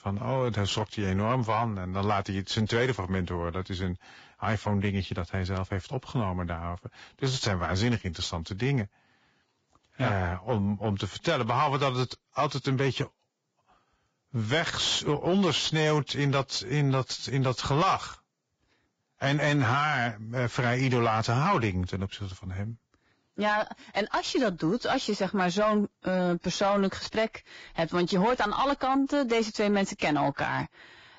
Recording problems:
garbled, watery; badly; nothing above 7.5 kHz
distortion; slight; 10 dB below the speech

